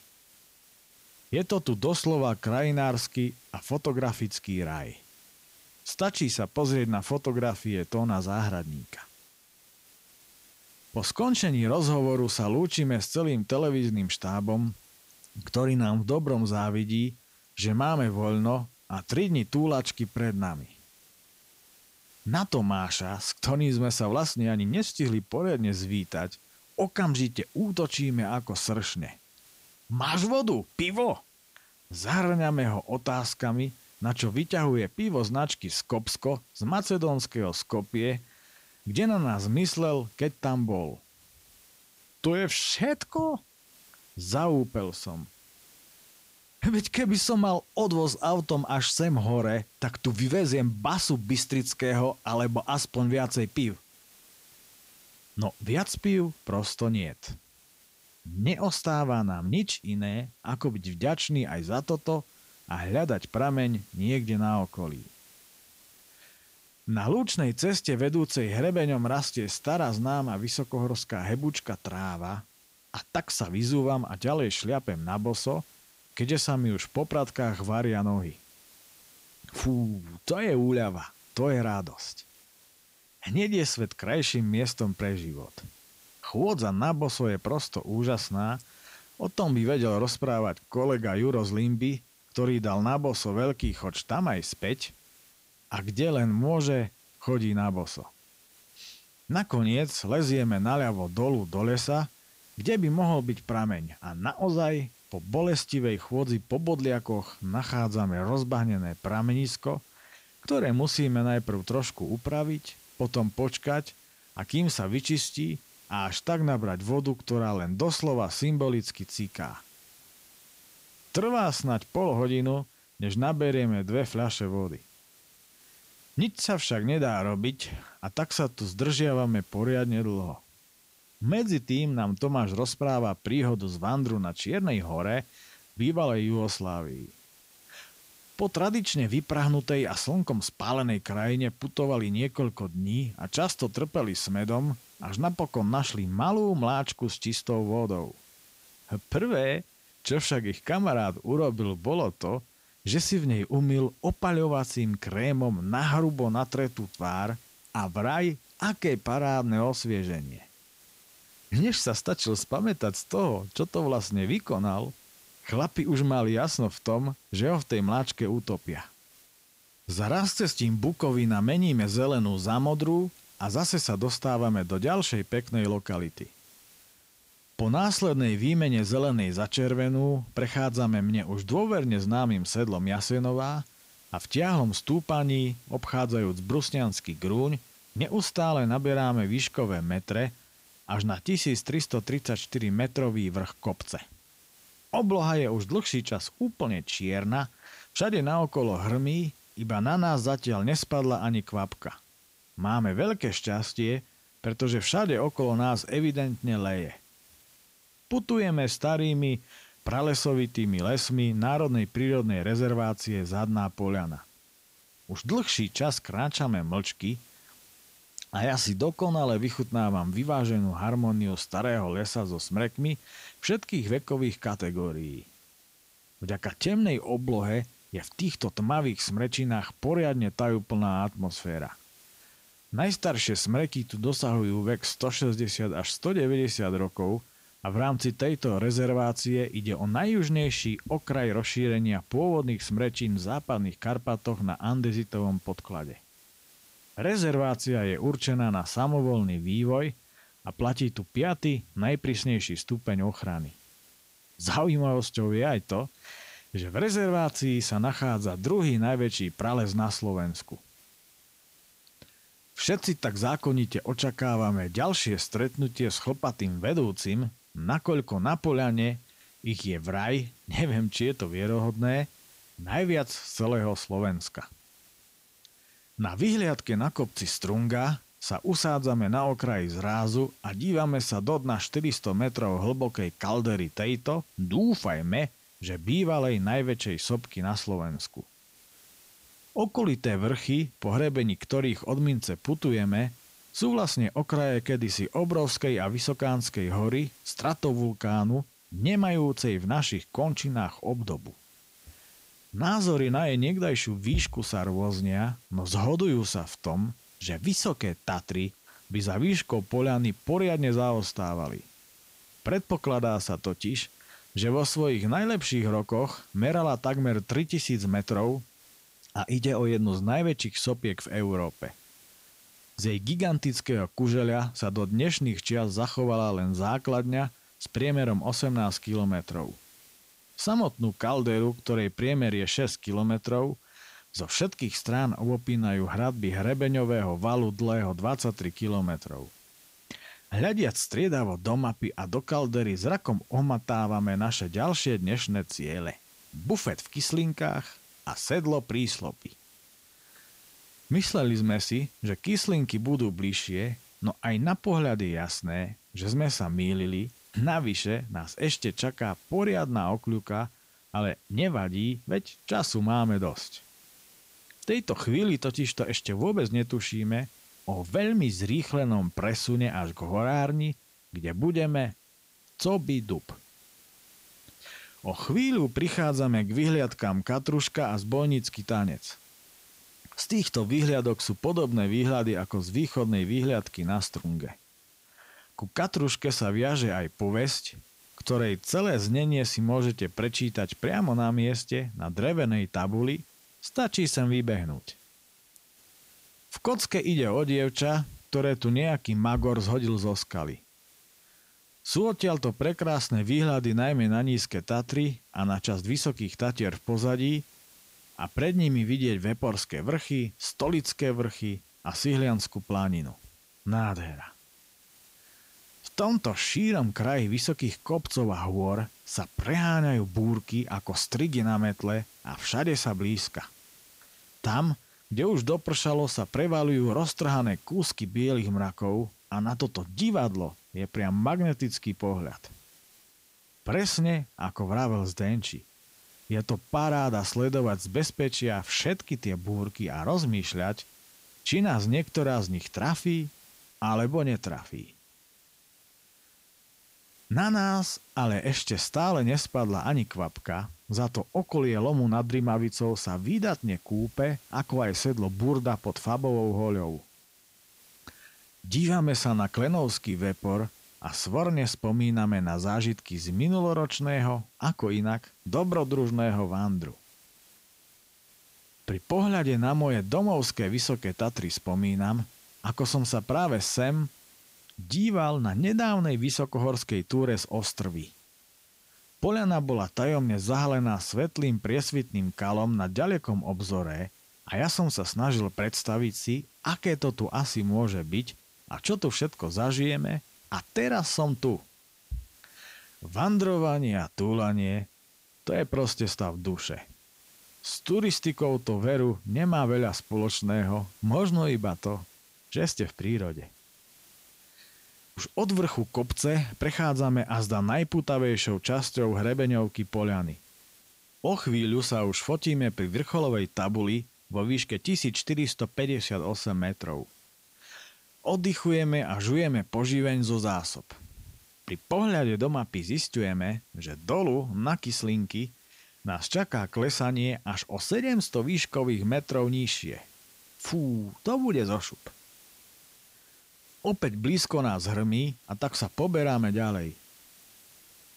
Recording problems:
hiss; faint; throughout; 25 dB below the speech

